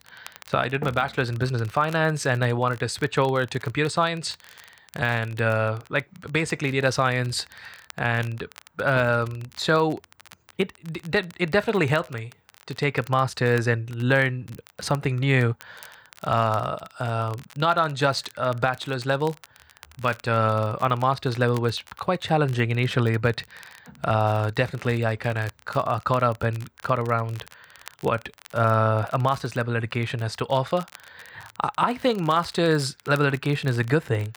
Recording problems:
crackle, like an old record; faint; 25 dB below the speech

